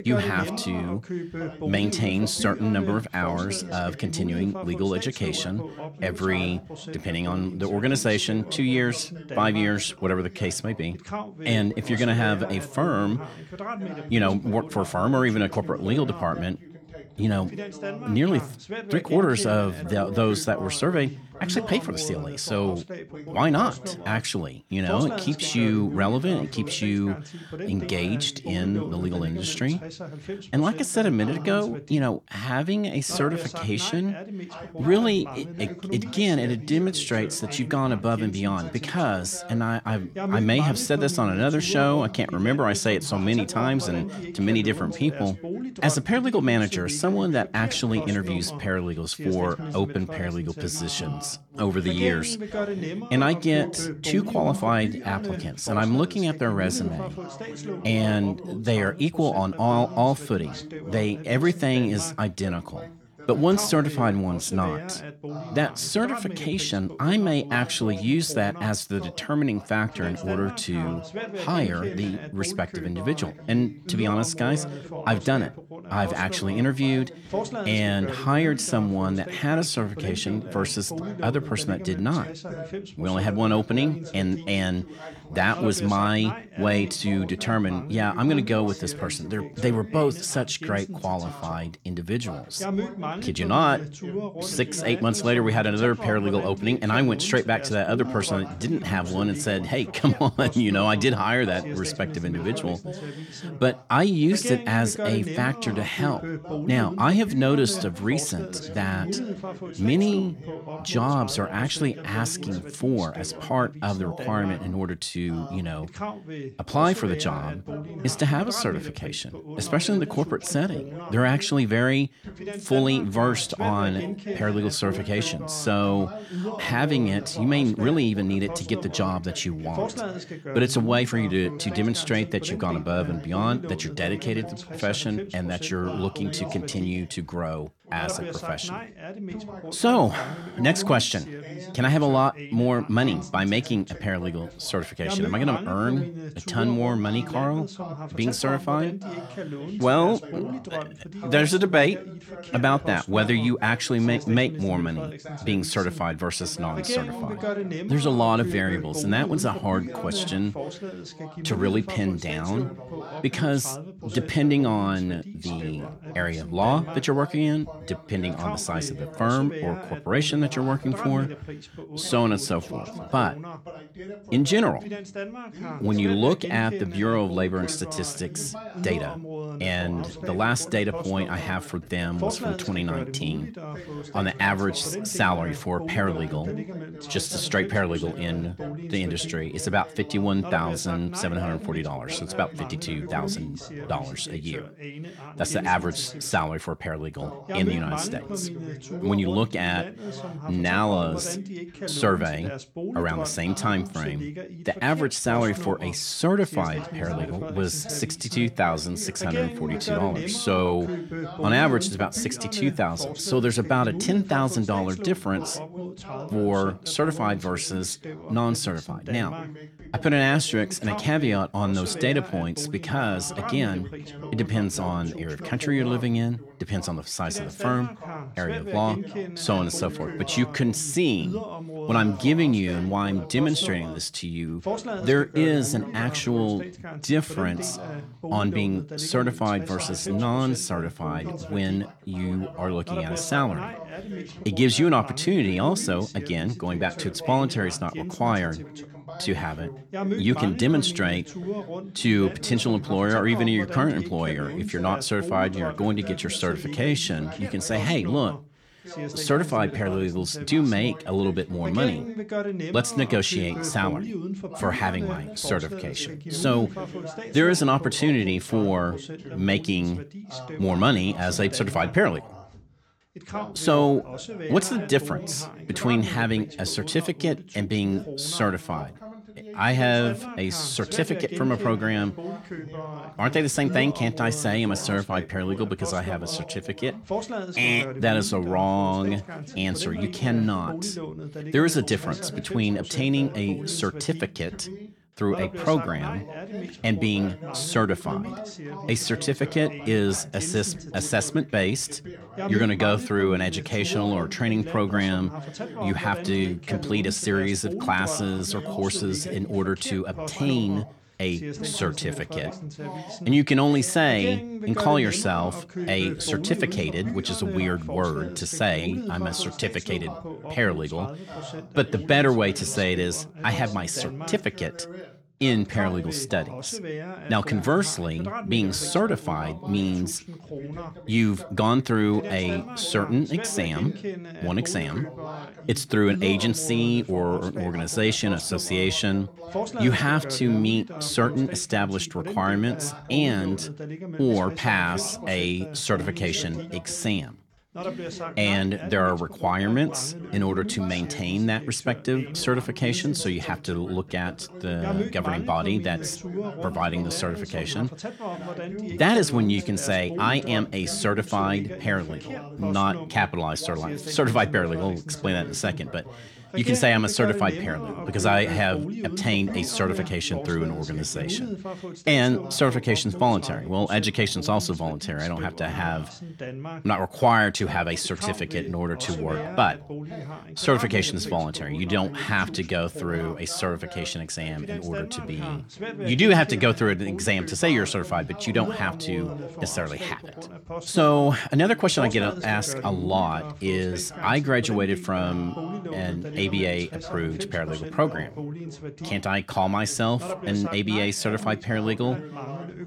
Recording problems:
background chatter; loud; throughout; 2 voices, 10 dB below the speech

